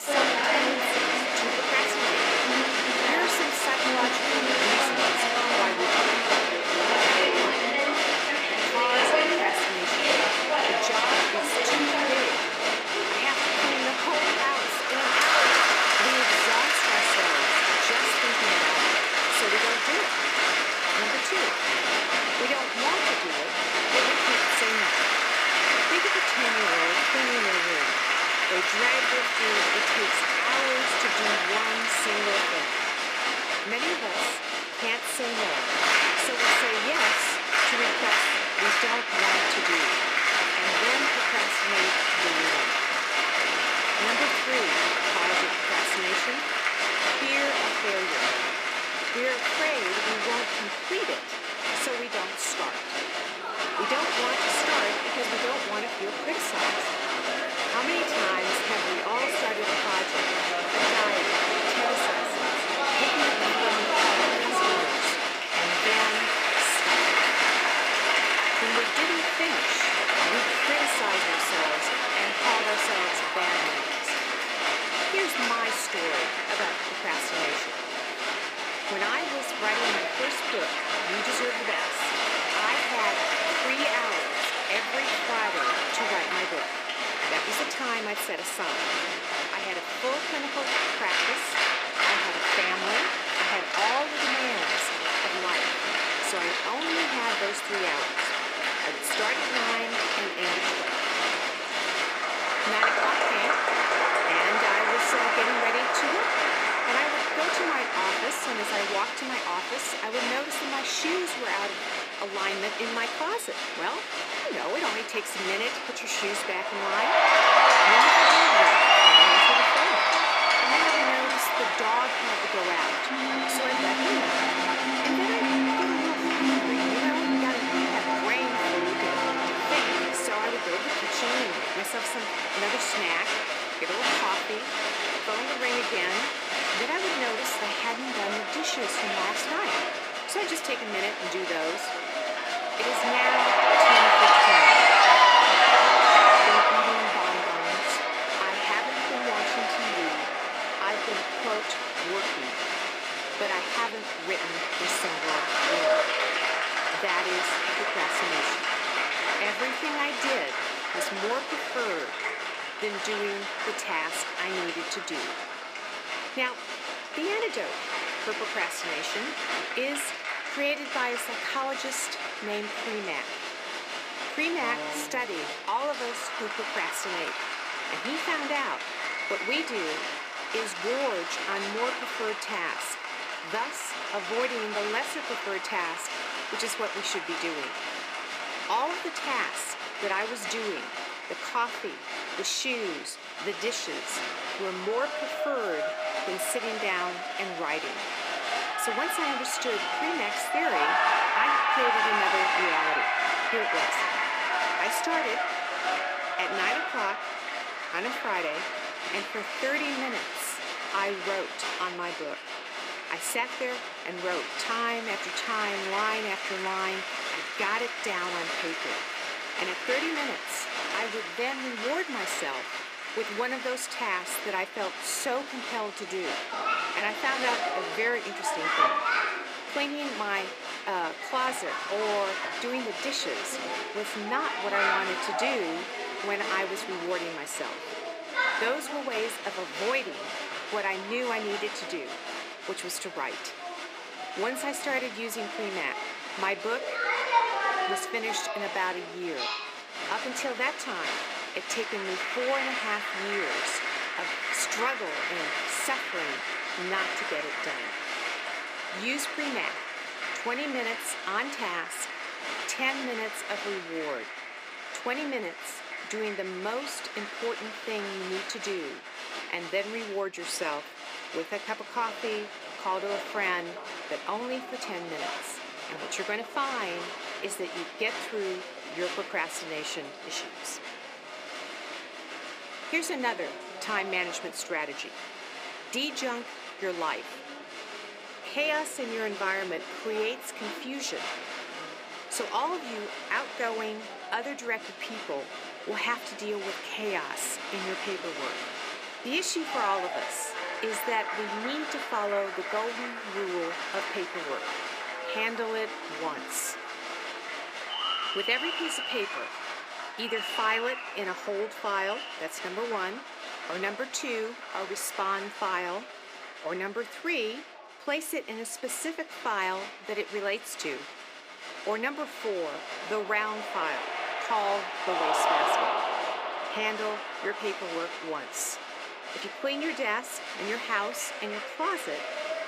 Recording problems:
thin; somewhat; fading below 350 Hz
crowd noise; very loud; throughout; 7 dB above the speech
abrupt cut into speech; at the start

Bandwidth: 15 kHz